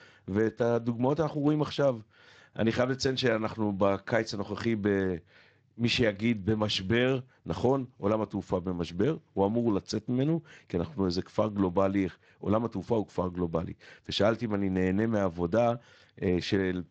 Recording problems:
garbled, watery; slightly; nothing above 7.5 kHz

